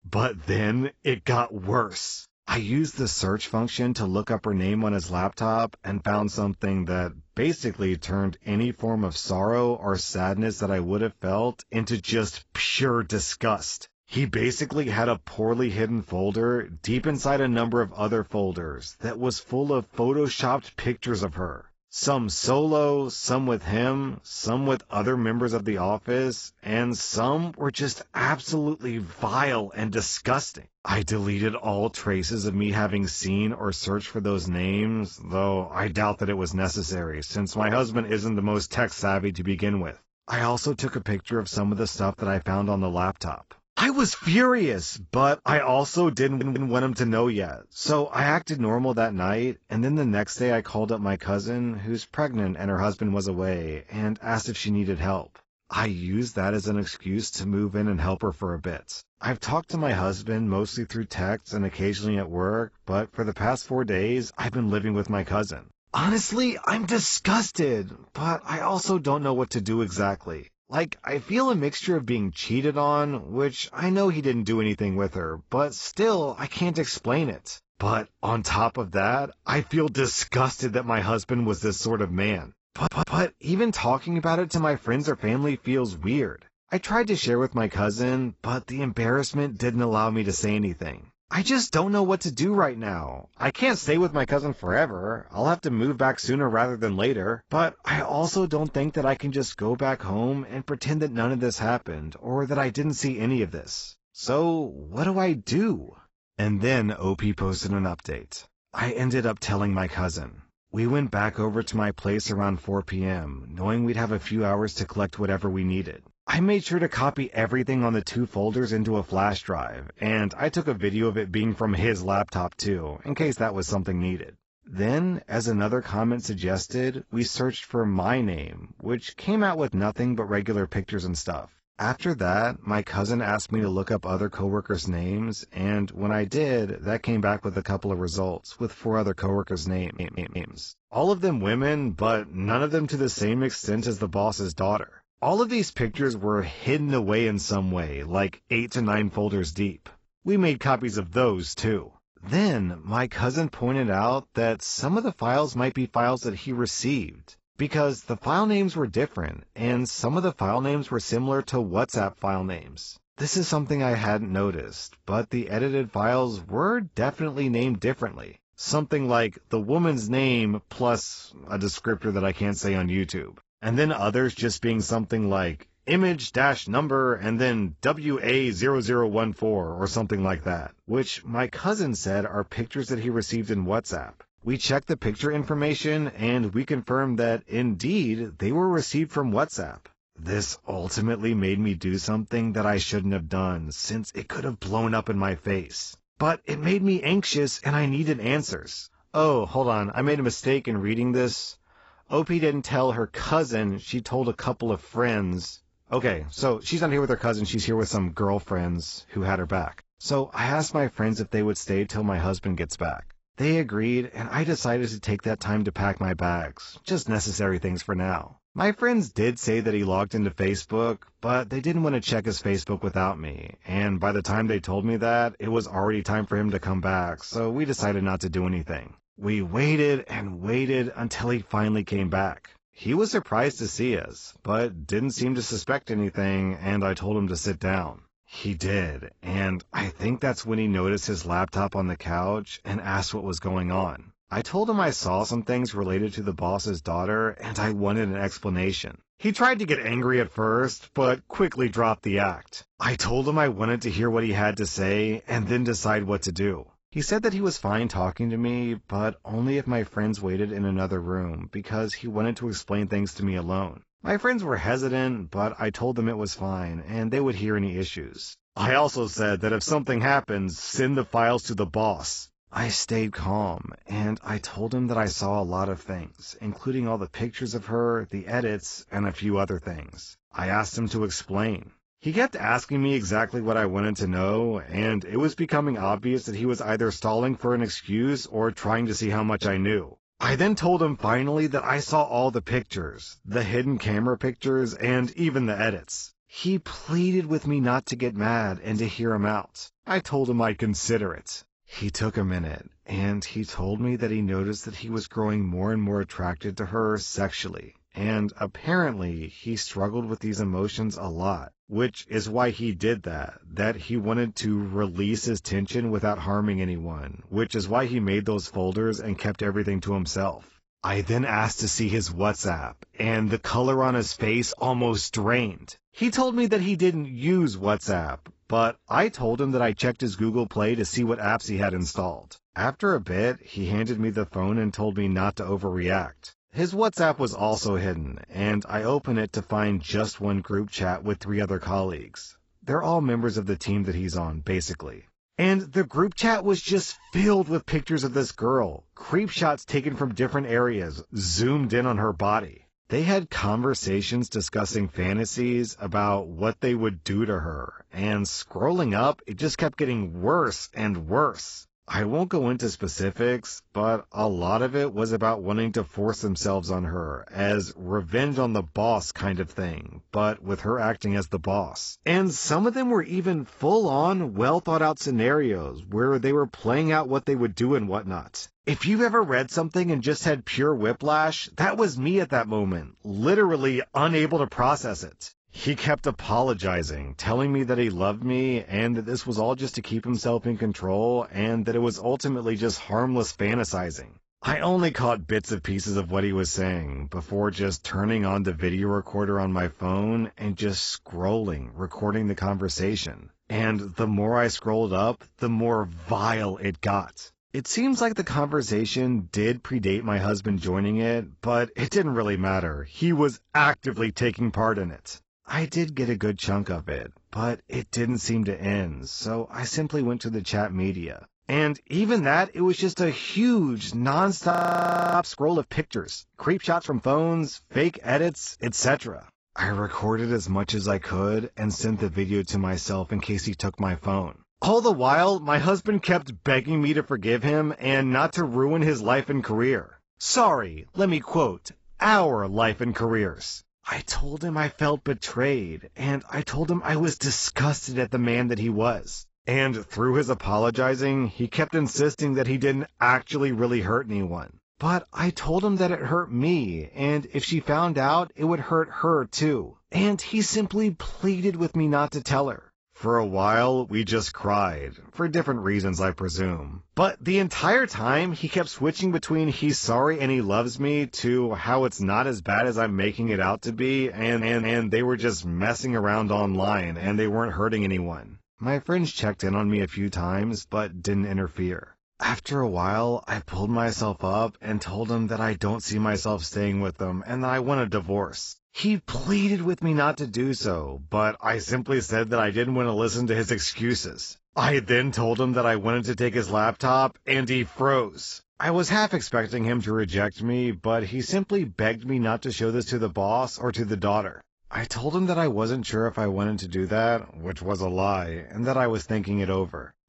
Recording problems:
garbled, watery; badly; nothing above 7.5 kHz
audio stuttering; 4 times, first at 46 s
audio freezing; at 7:05 for 0.5 s

